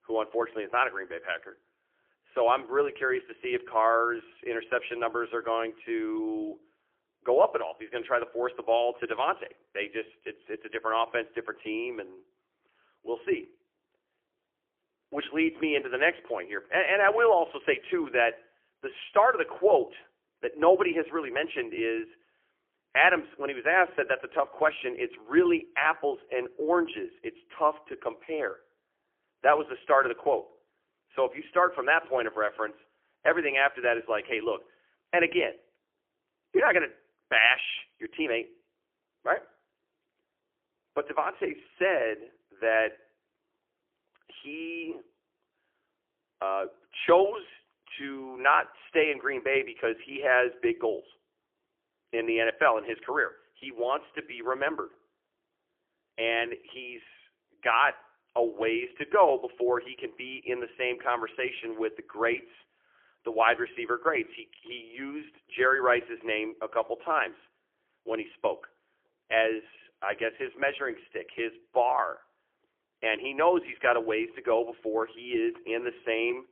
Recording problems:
phone-call audio; poor line; nothing above 3 kHz

